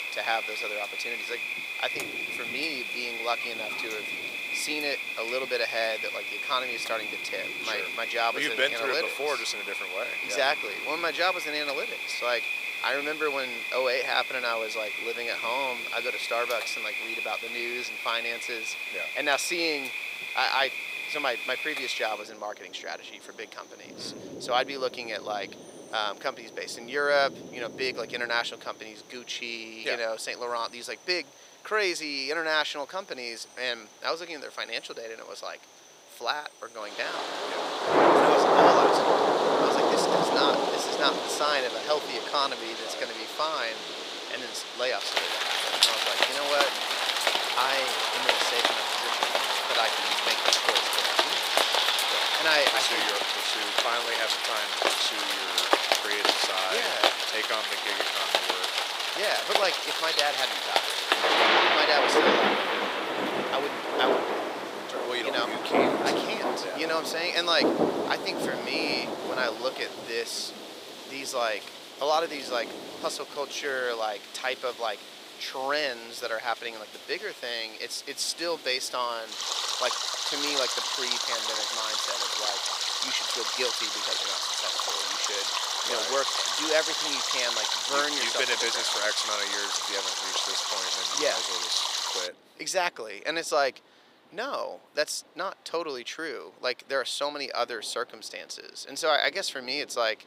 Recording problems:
thin; very; fading below 450 Hz
rain or running water; very loud; throughout; 4 dB above the speech

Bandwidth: 15.5 kHz